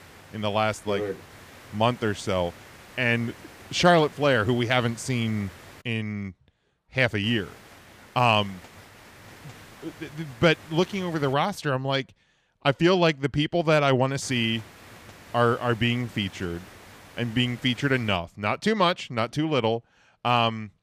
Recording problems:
hiss; faint; until 6 s, from 7 to 11 s and from 14 to 18 s; 20 dB below the speech

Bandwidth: 15 kHz